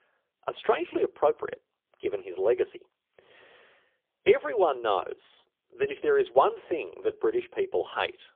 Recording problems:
phone-call audio; poor line; nothing above 3.5 kHz

